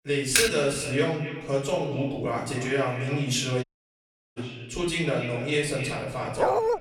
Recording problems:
echo of what is said; strong; throughout; 270 ms later, 10 dB below the speech
off-mic speech; far
room echo; slight; dies away in 0.6 s
keyboard typing; loud; at 0.5 s; peak 4 dB above the speech
audio cutting out; at 3.5 s for 0.5 s
dog barking; loud; at 6.5 s; peak 4 dB above the speech

